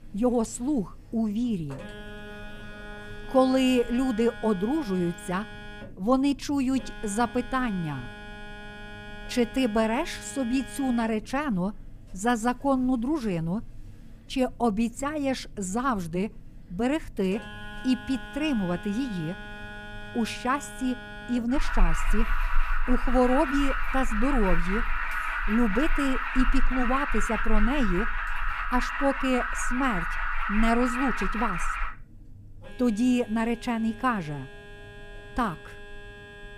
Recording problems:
alarms or sirens; loud; throughout; 6 dB below the speech

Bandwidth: 15 kHz